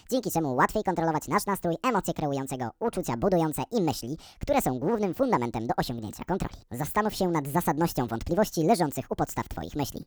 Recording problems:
wrong speed and pitch; too fast and too high; 1.5 times normal speed

